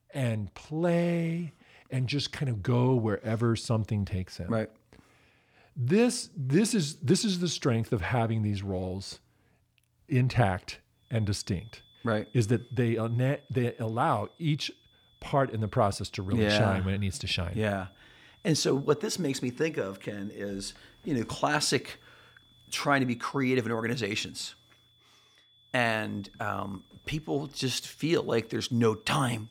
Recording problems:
high-pitched whine; faint; from 11 s on; 3.5 kHz, 30 dB below the speech

